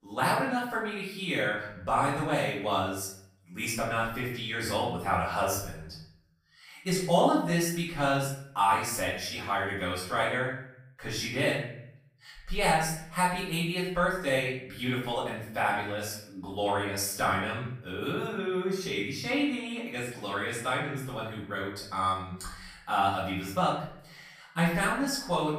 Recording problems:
off-mic speech; far
room echo; noticeable; dies away in 0.6 s

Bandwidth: 15 kHz